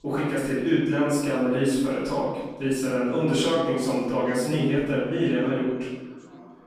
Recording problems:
room echo; strong; dies away in 1.2 s
off-mic speech; far
background chatter; faint; throughout; 3 voices, 25 dB below the speech

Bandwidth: 14.5 kHz